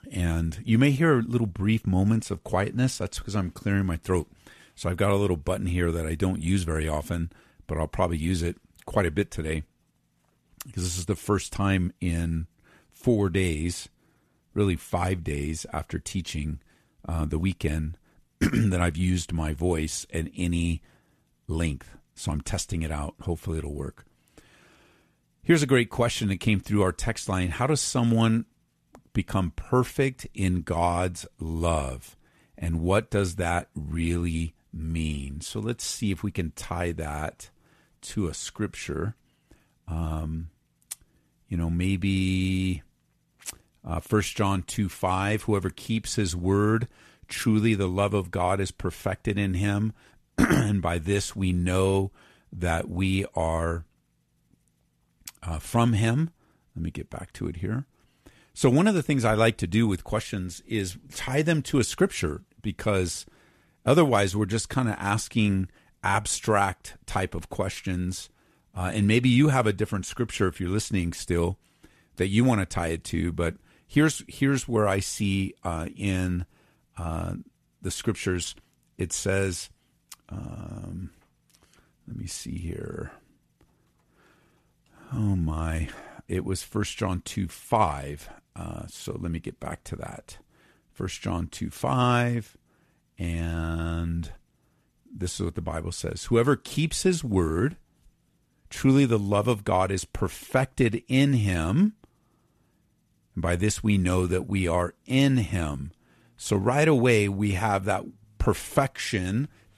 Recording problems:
none

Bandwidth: 13.5 kHz